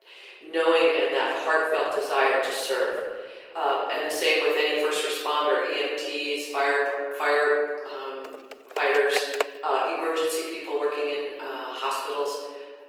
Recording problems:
room echo; strong; dies away in 1.3 s
off-mic speech; far
thin; very; fading below 400 Hz
garbled, watery; slightly
keyboard typing; noticeable; from 8.5 to 9.5 s; peak 5 dB below the speech

